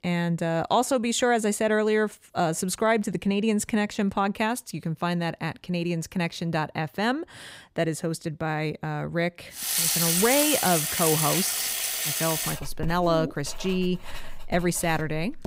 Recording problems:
household noises; very loud; from 9.5 s on; 2 dB above the speech

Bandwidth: 15.5 kHz